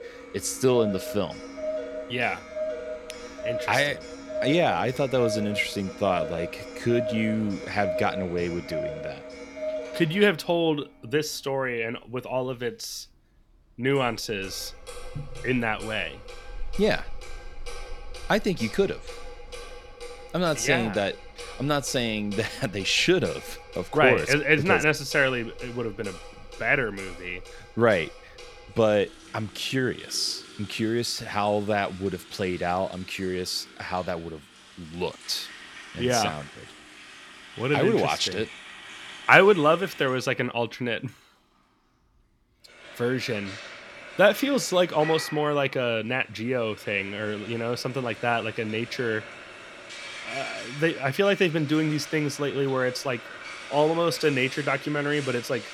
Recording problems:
household noises; noticeable; throughout; 15 dB below the speech

